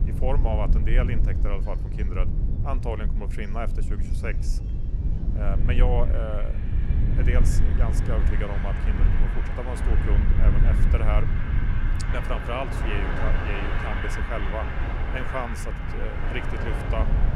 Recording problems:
train or aircraft noise; loud; throughout; 2 dB below the speech
low rumble; loud; throughout; 8 dB below the speech
electrical hum; faint; throughout; 50 Hz, 30 dB below the speech

